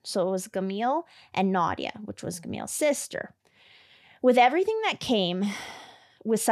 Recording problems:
abrupt cut into speech; at the end

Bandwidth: 13.5 kHz